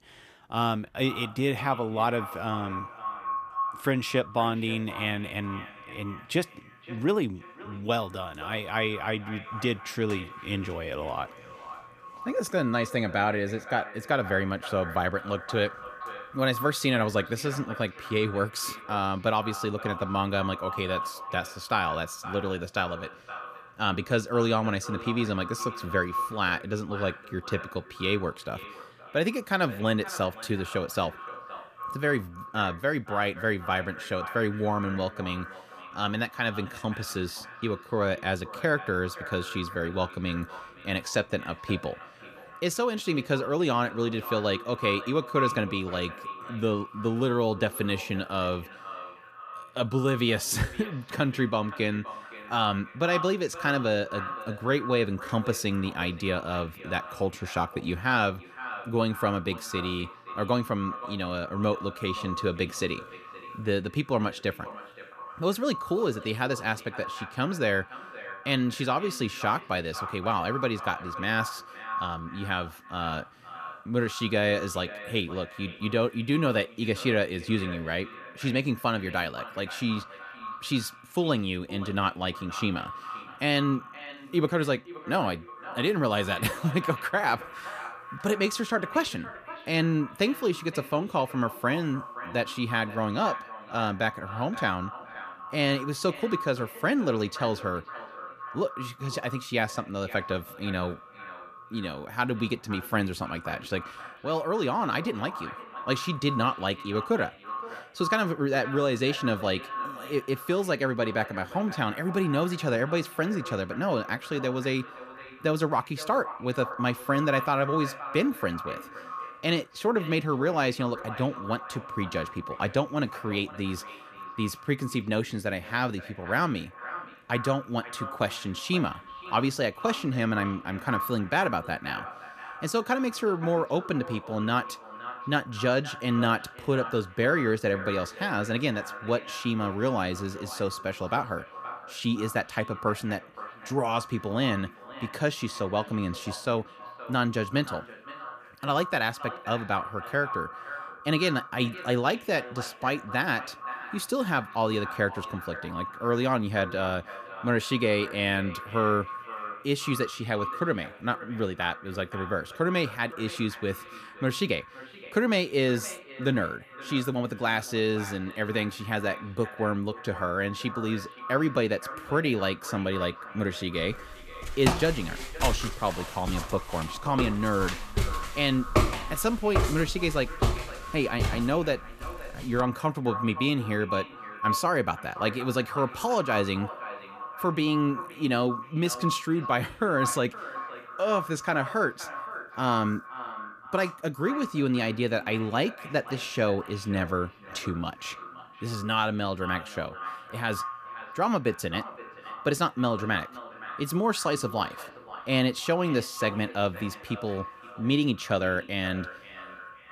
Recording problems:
echo of what is said; strong; throughout; 520 ms later, 10 dB below the speech
footsteps; loud; from 2:54 to 3:03; peak 3 dB above the speech

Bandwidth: 14.5 kHz